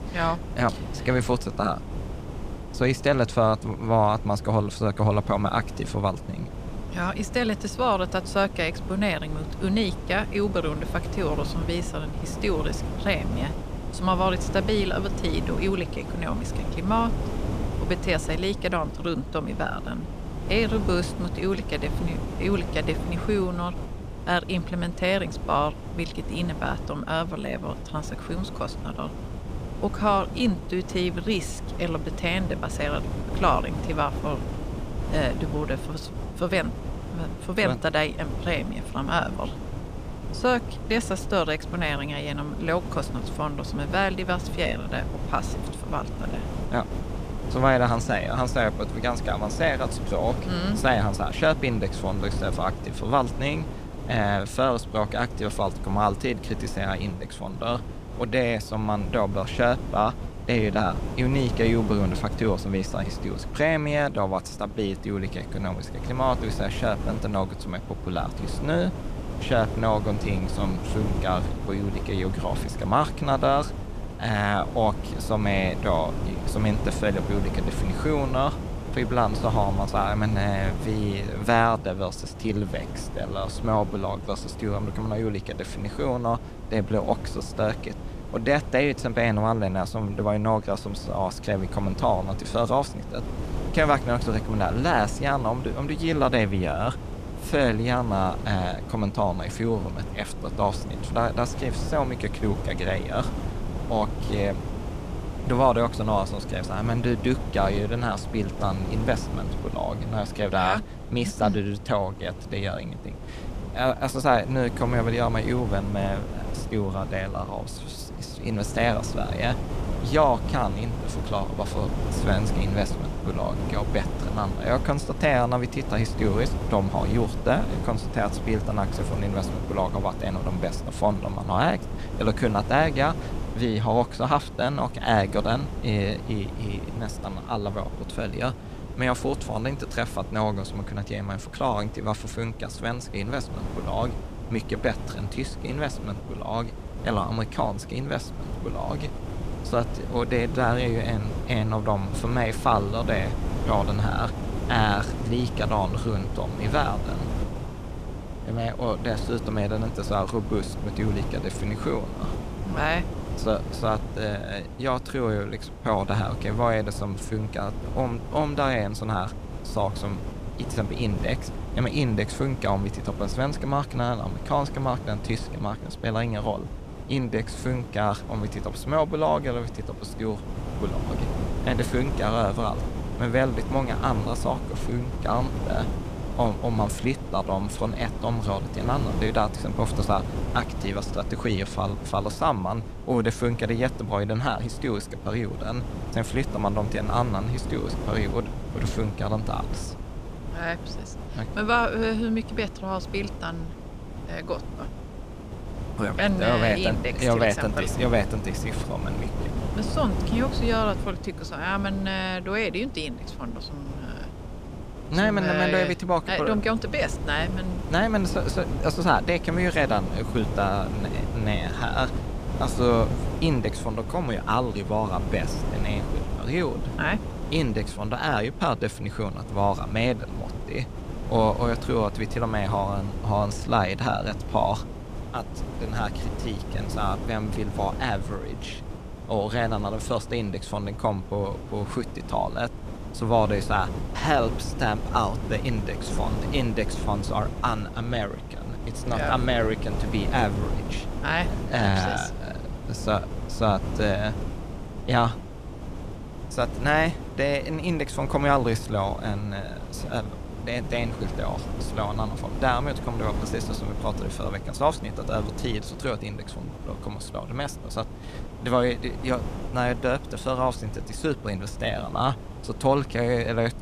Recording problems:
wind noise on the microphone; occasional gusts; 10 dB below the speech

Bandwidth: 14.5 kHz